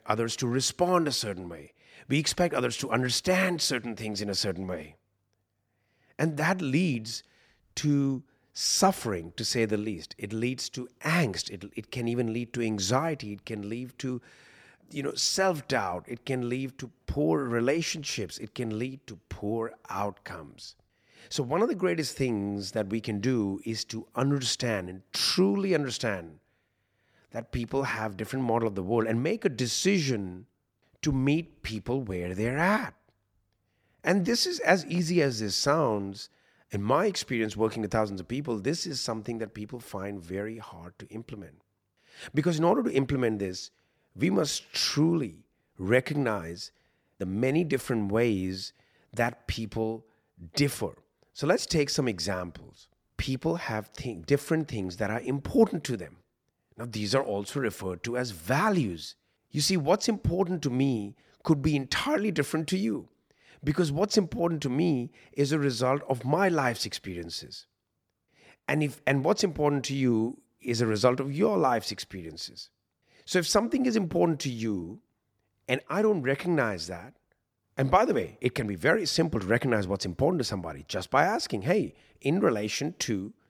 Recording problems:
none

